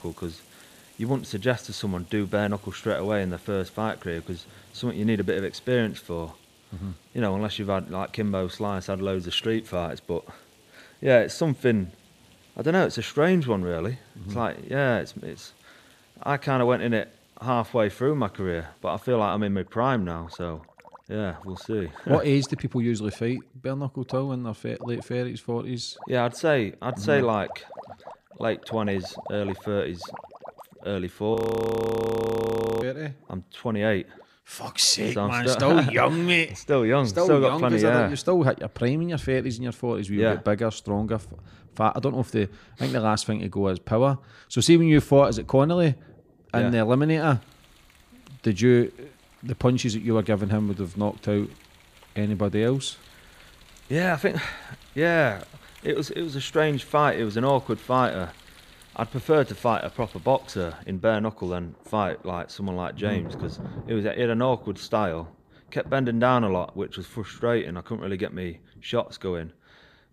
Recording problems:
rain or running water; faint; throughout; 25 dB below the speech
audio freezing; at 31 s for 1.5 s

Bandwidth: 15 kHz